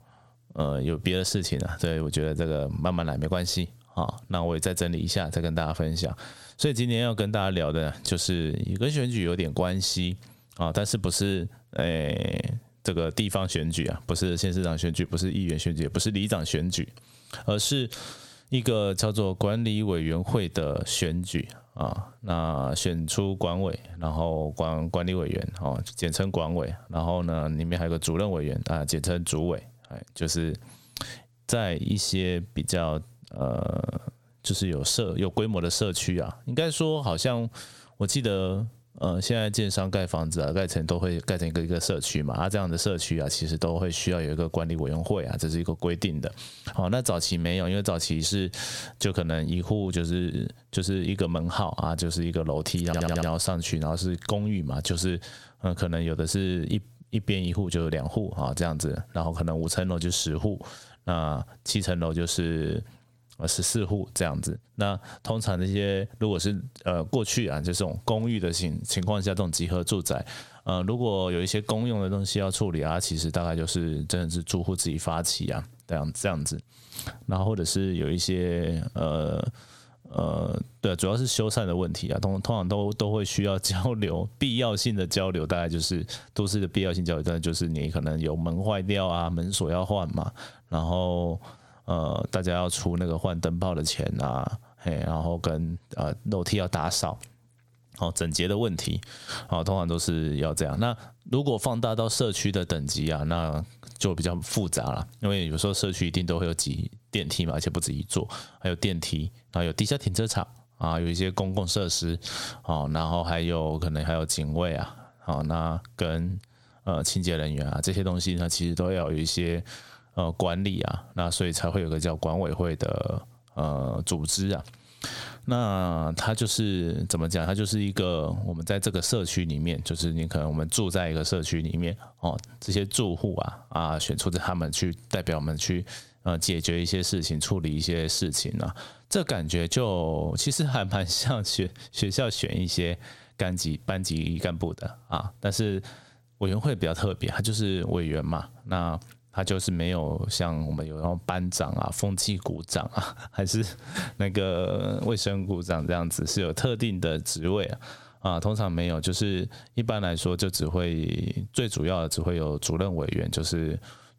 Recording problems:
squashed, flat; heavily
audio stuttering; at 53 s

